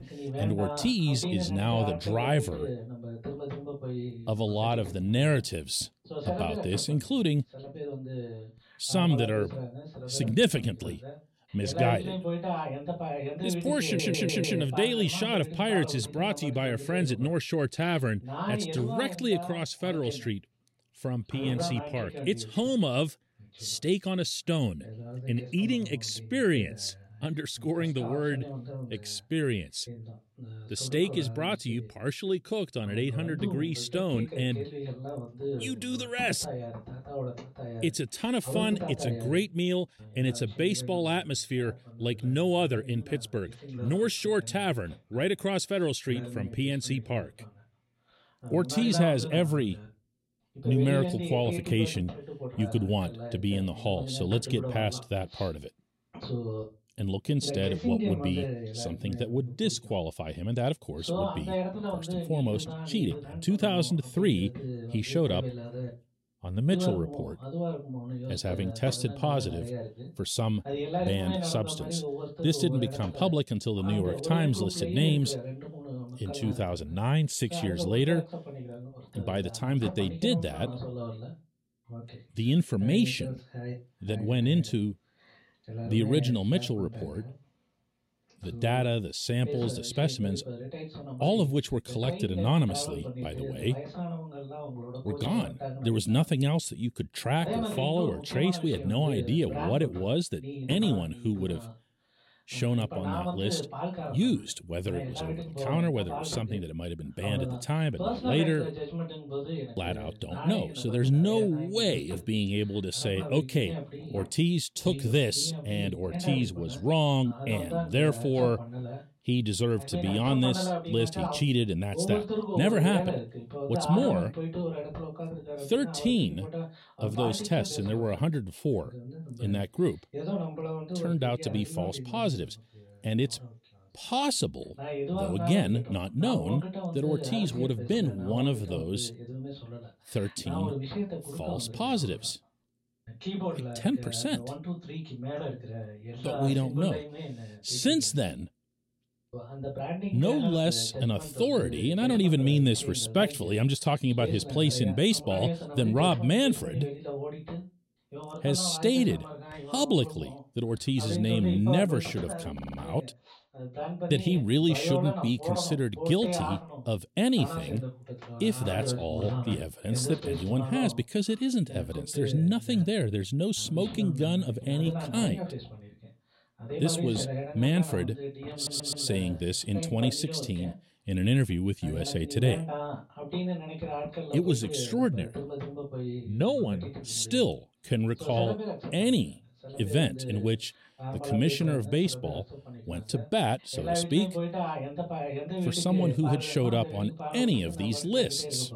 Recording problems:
voice in the background; loud; throughout; 8 dB below the speech
audio stuttering; at 14 s, at 2:43 and at 2:59

